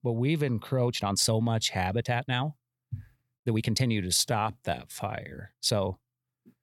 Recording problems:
uneven, jittery; strongly; from 1 to 6 s

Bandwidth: 17.5 kHz